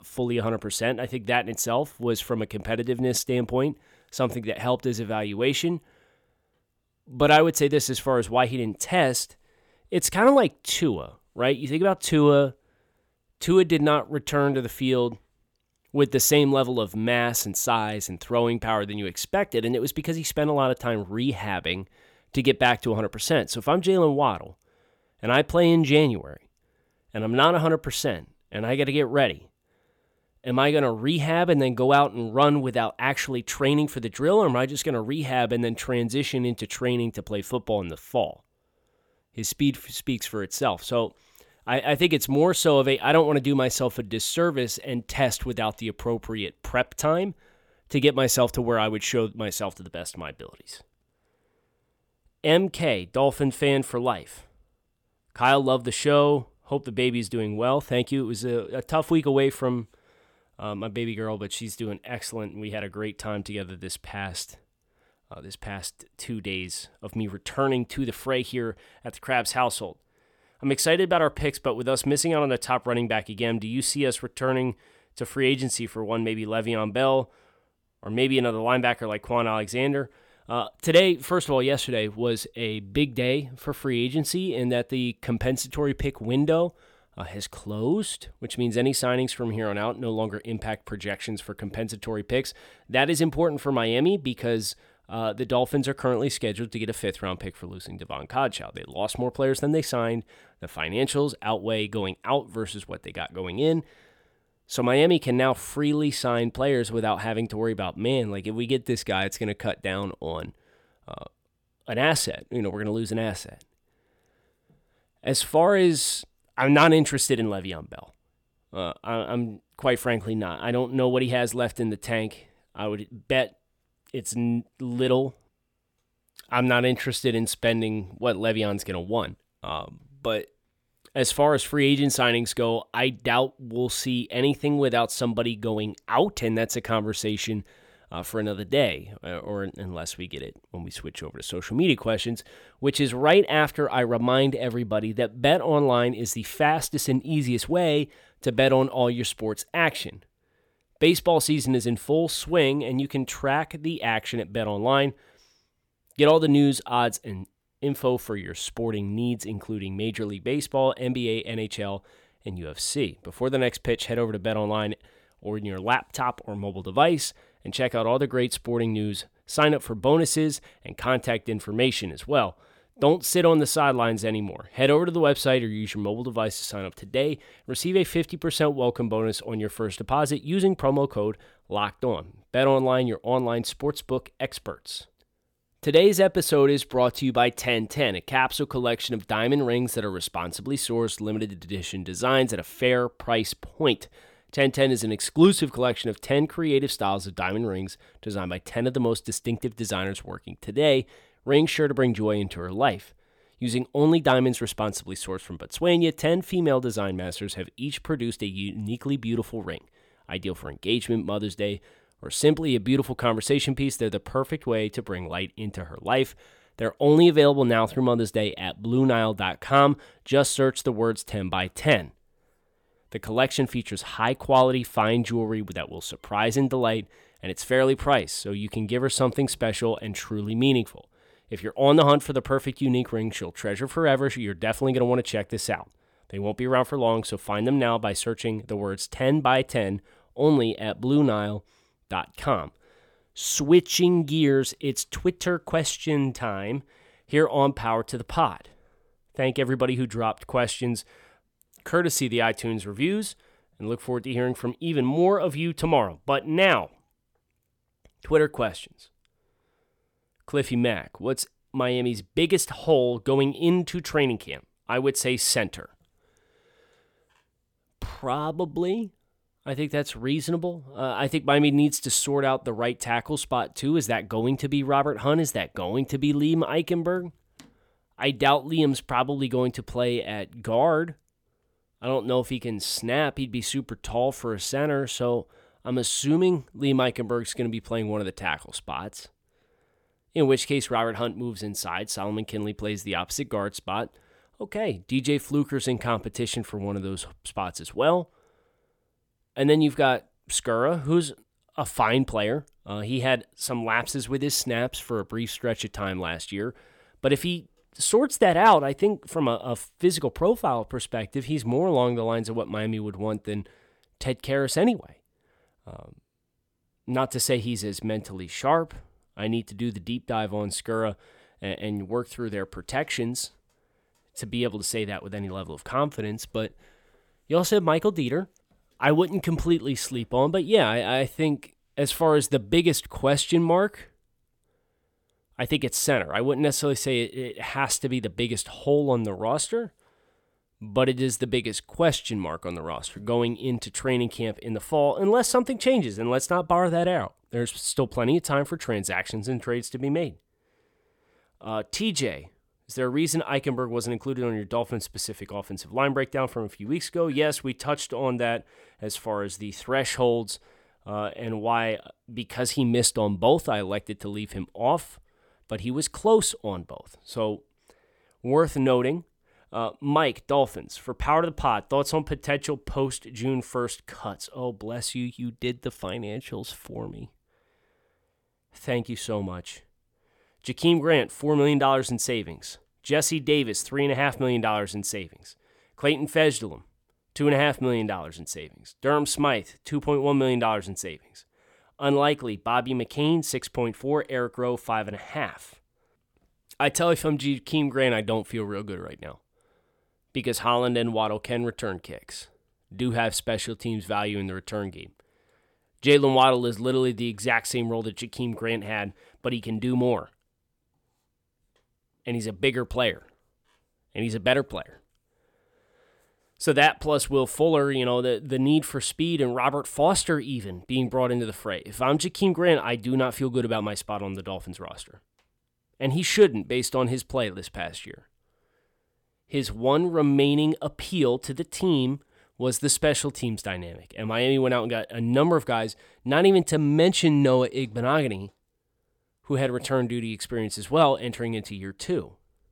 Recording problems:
none

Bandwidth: 18 kHz